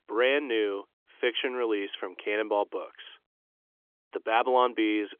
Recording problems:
phone-call audio; nothing above 3.5 kHz

